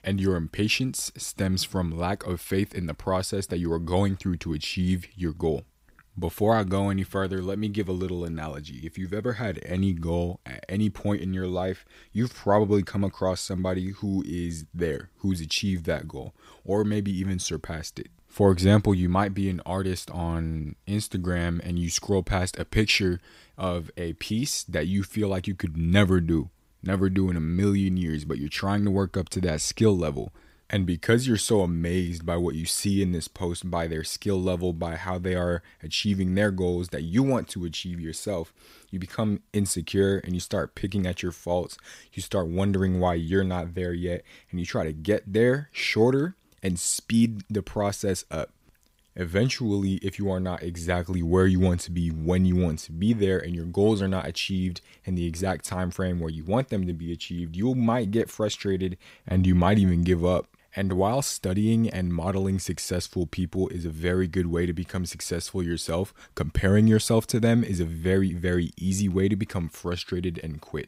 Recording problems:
none

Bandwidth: 15.5 kHz